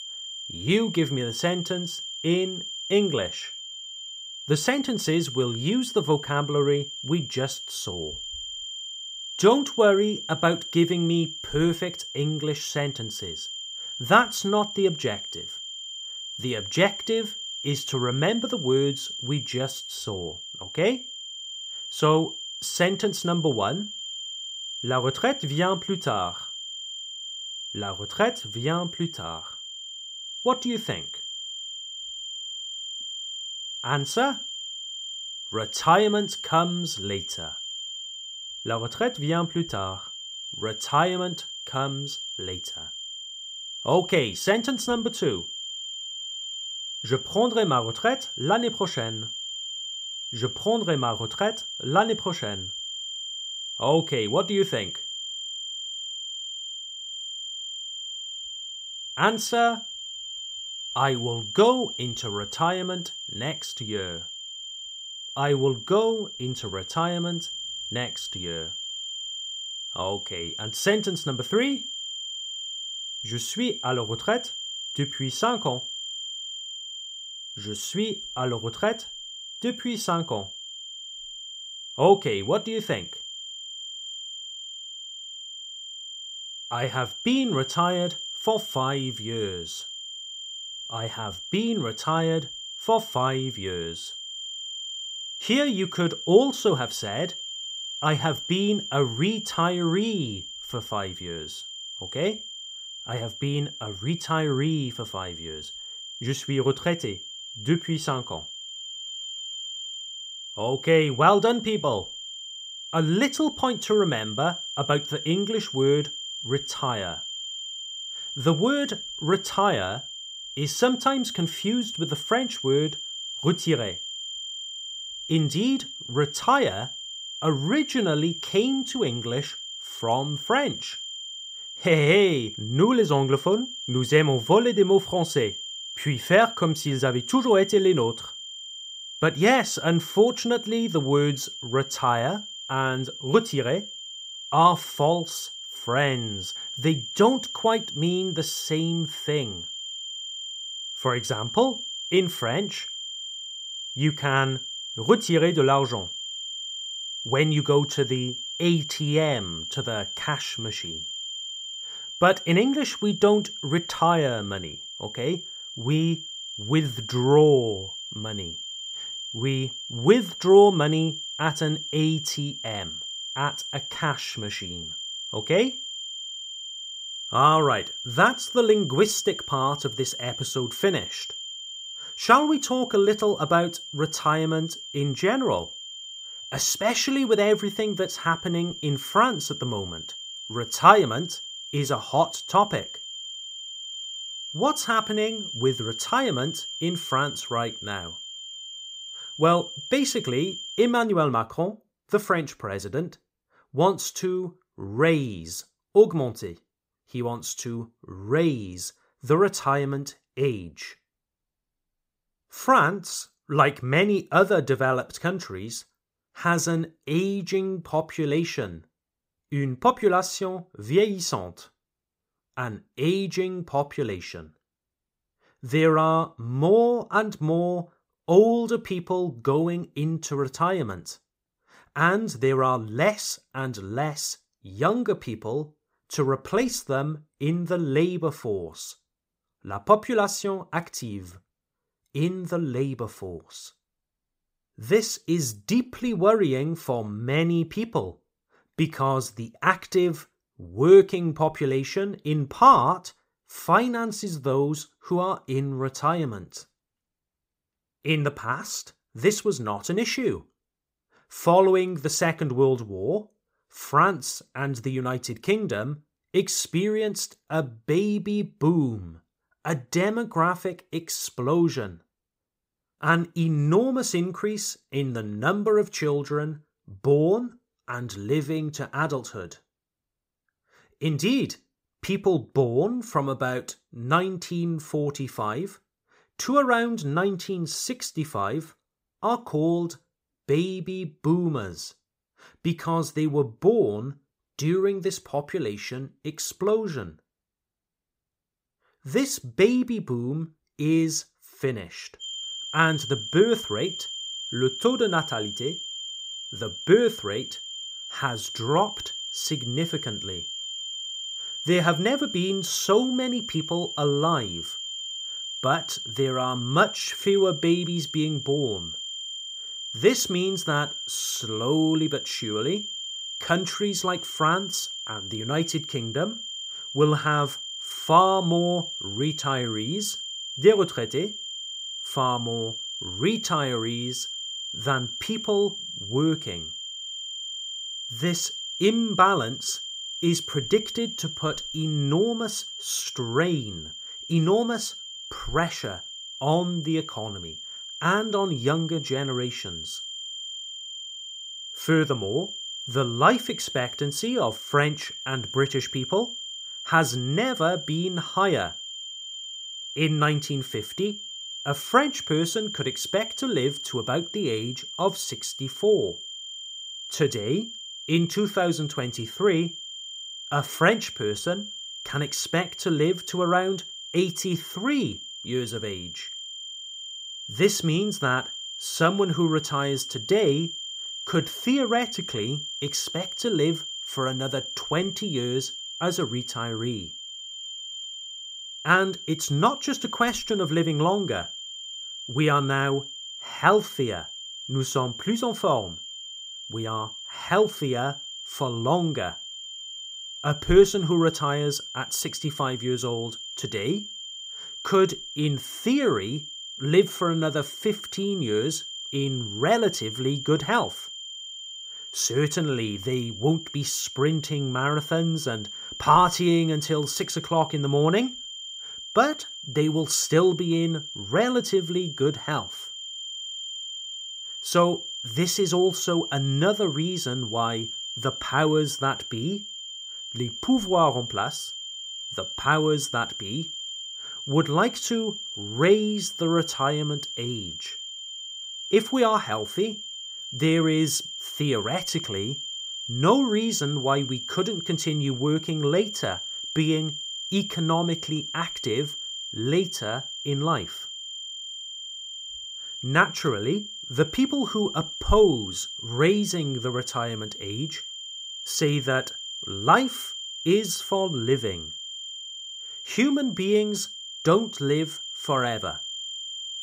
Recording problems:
high-pitched whine; loud; until 3:21 and from 5:02 on; 3 kHz, 8 dB below the speech

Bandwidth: 15.5 kHz